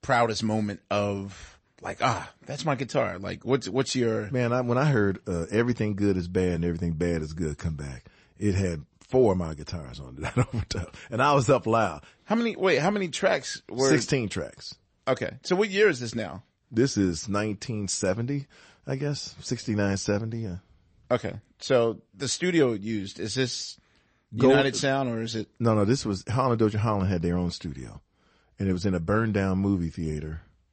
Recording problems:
garbled, watery; slightly; nothing above 8 kHz

